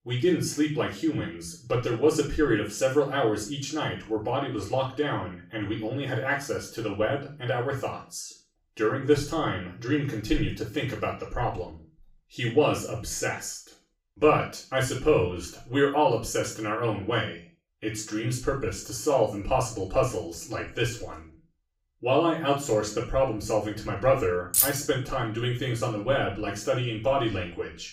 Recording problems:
off-mic speech; far
room echo; noticeable; dies away in 0.3 s
jangling keys; loud; at 25 s; peak 5 dB above the speech

